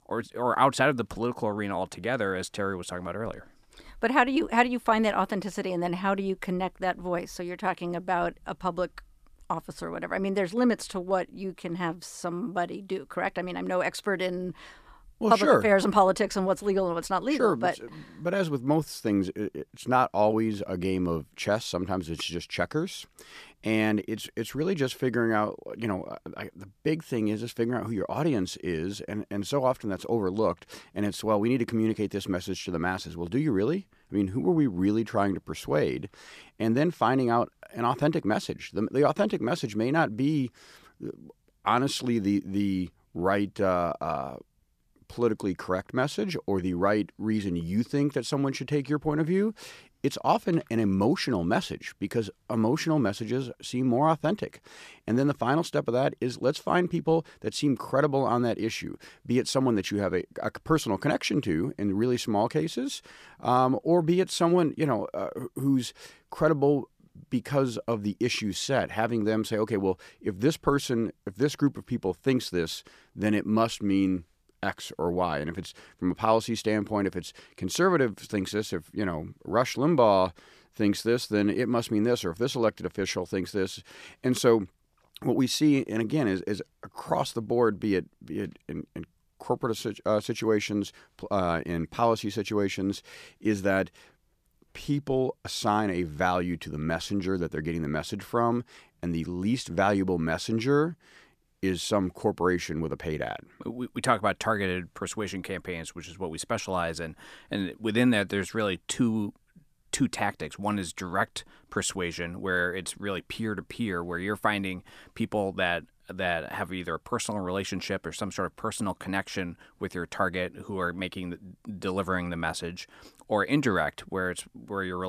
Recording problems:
abrupt cut into speech; at the end

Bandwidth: 14.5 kHz